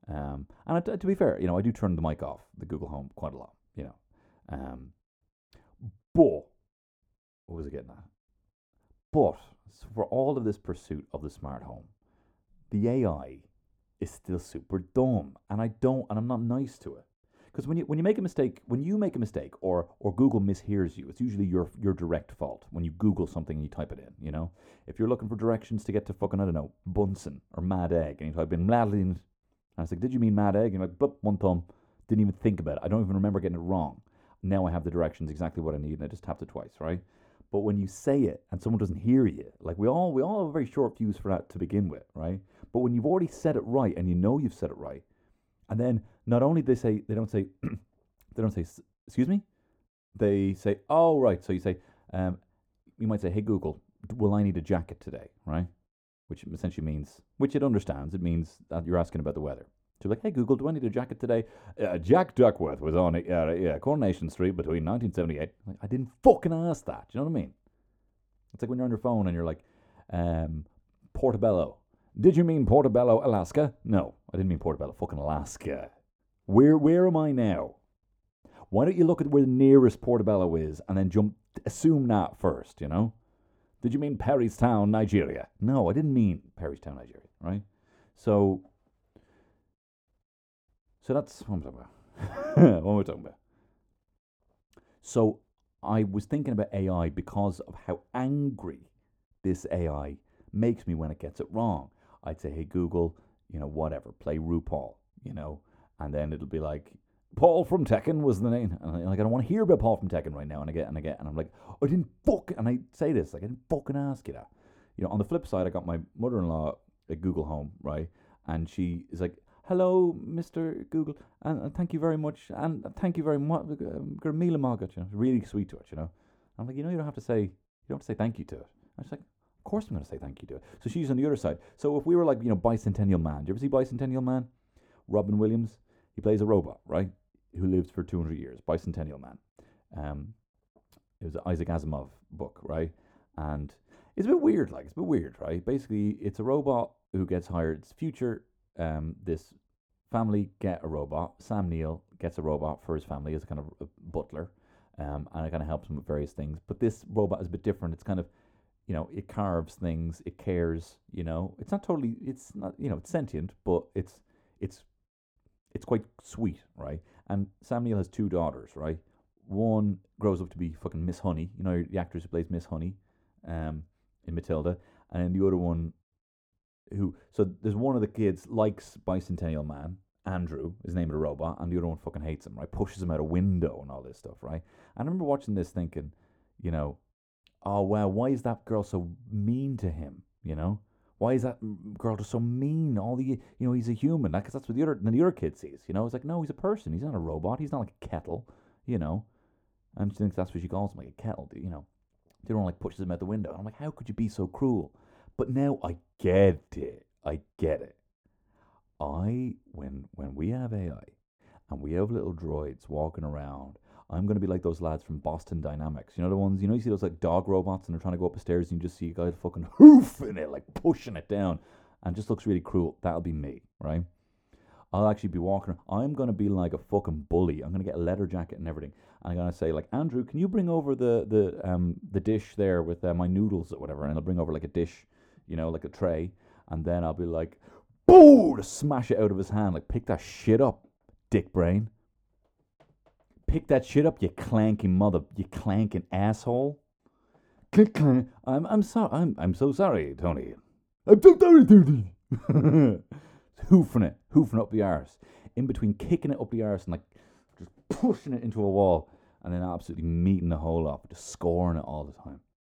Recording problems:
muffled; very; fading above 1 kHz

